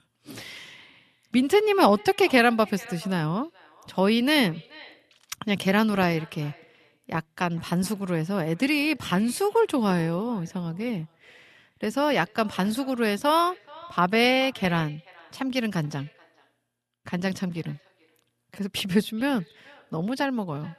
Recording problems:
echo of what is said; faint; throughout; 430 ms later, 25 dB below the speech

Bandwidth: 13.5 kHz